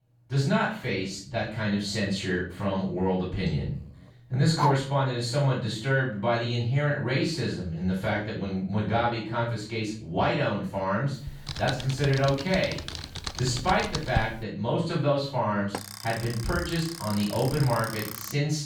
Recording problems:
off-mic speech; far
room echo; noticeable; dies away in 0.4 s
dog barking; noticeable; at 4.5 s; peak 1 dB below the speech
keyboard typing; noticeable; from 11 to 14 s; peak 4 dB below the speech
alarm; noticeable; from 16 s on; peak 8 dB below the speech

